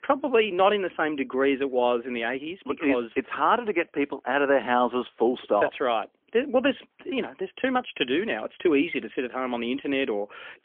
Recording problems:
phone-call audio; poor line; nothing above 3.5 kHz

